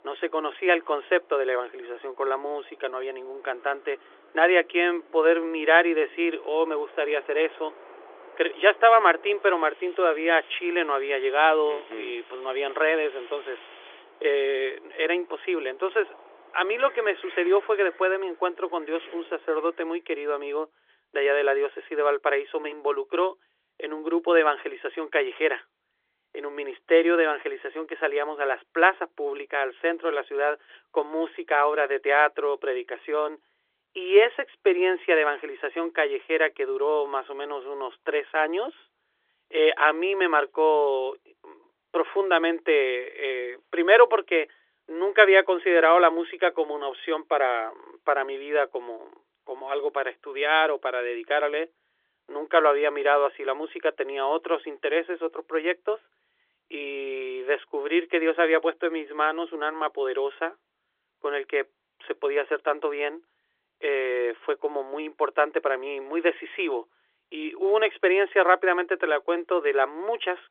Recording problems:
phone-call audio; nothing above 3.5 kHz
wind in the background; faint; until 20 s; 25 dB below the speech

